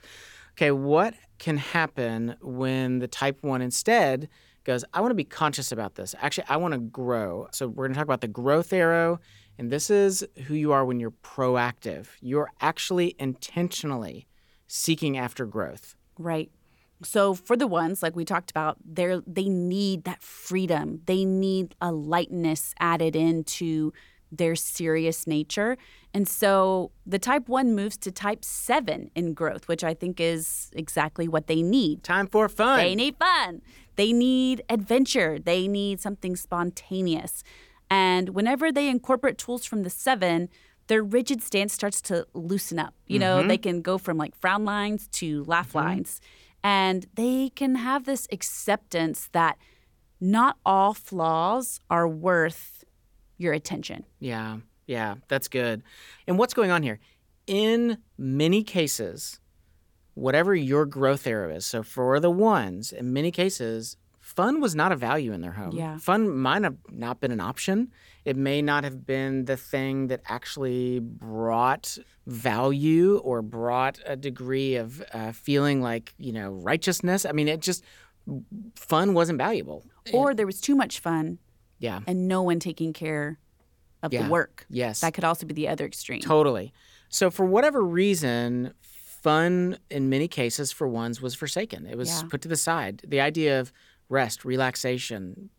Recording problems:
none

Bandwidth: 18 kHz